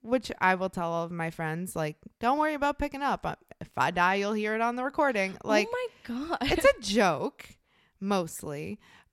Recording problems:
none

